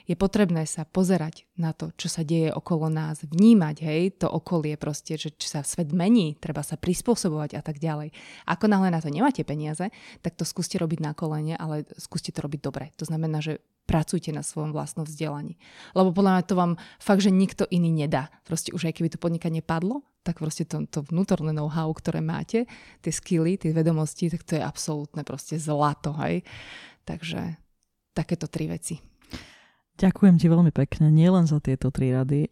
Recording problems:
none

